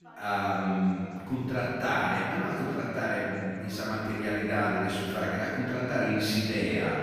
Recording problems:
room echo; strong; dies away in 2.1 s
off-mic speech; far
background chatter; faint; throughout; 3 voices, 20 dB below the speech

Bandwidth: 14.5 kHz